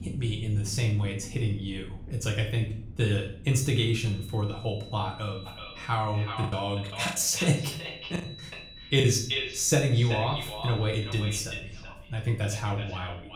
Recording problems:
echo of what is said; strong; from 5.5 s on; 380 ms later, 9 dB below the speech
room echo; slight; dies away in 0.5 s
off-mic speech; somewhat distant
high-pitched whine; noticeable; from 3.5 to 11 s; 4 kHz, 15 dB below the speech
low rumble; faint; throughout; 25 dB below the speech
choppy; very; from 6.5 to 9 s; 14% of the speech affected

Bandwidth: 18 kHz